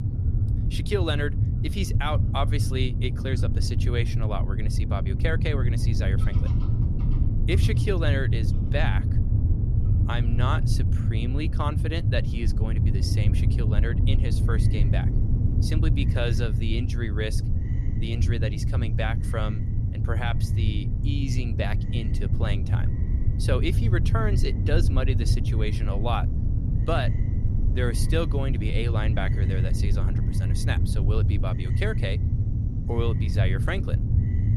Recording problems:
low rumble; loud; throughout; 6 dB below the speech
animal sounds; faint; throughout; 25 dB below the speech

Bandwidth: 14.5 kHz